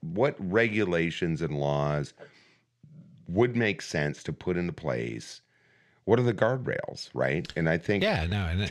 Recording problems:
abrupt cut into speech; at the end

